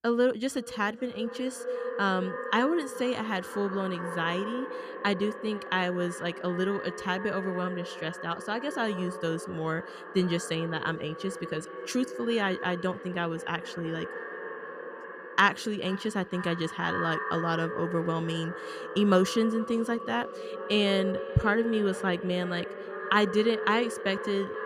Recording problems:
echo of what is said; strong; throughout; 470 ms later, 8 dB below the speech

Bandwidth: 14.5 kHz